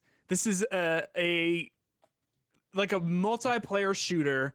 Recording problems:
garbled, watery; slightly; nothing above 19 kHz

